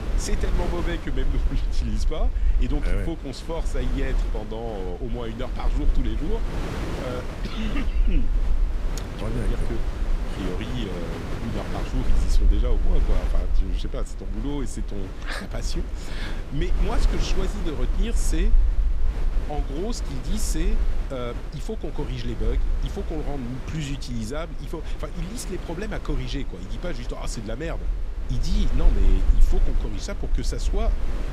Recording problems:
wind noise on the microphone; heavy; 5 dB below the speech
low rumble; noticeable; throughout; 20 dB below the speech

